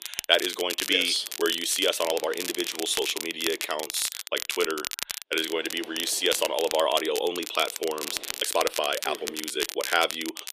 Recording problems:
thin; somewhat; fading below 350 Hz
crackle, like an old record; loud; 7 dB below the speech
wind noise on the microphone; occasional gusts; from 1 to 4 s and from 5.5 to 8.5 s; 25 dB below the speech
uneven, jittery; strongly; from 1 to 10 s

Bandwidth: 14.5 kHz